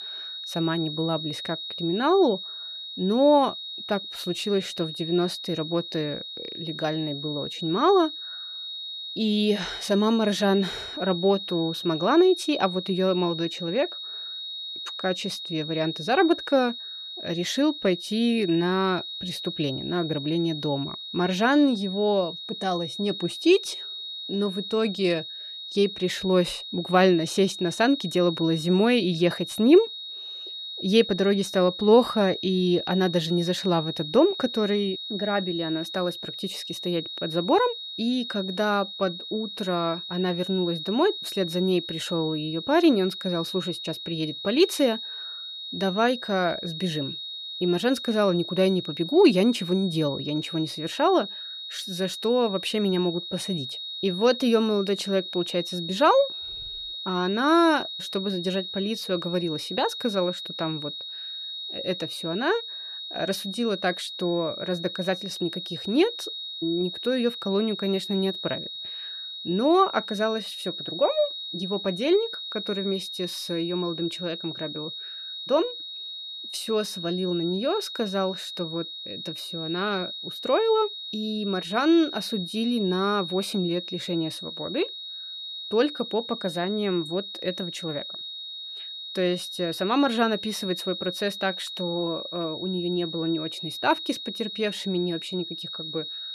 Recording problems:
high-pitched whine; loud; throughout; 4 kHz, 8 dB below the speech

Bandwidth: 14.5 kHz